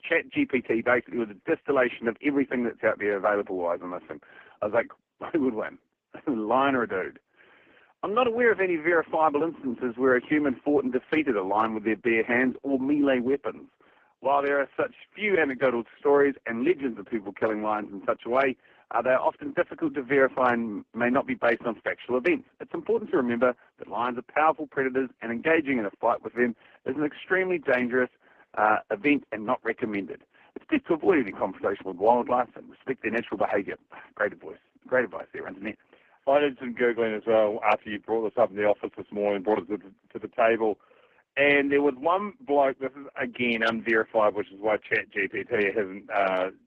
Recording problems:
phone-call audio; poor line
garbled, watery; slightly

